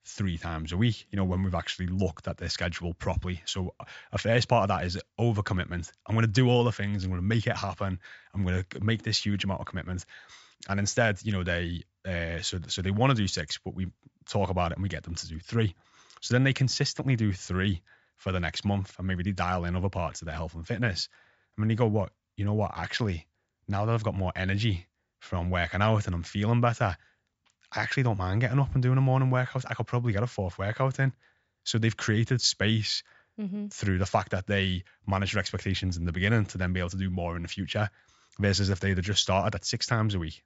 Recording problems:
high frequencies cut off; noticeable; nothing above 8 kHz

